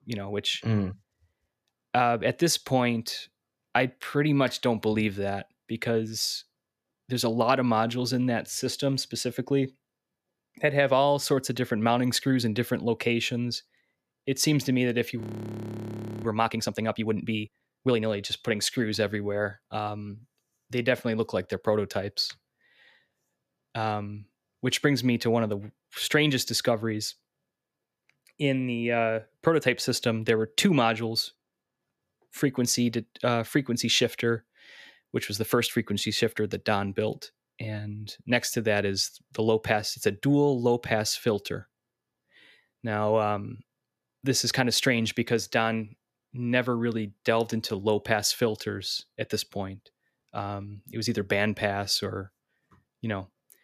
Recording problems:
audio freezing; at 15 s for 1 s

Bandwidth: 14.5 kHz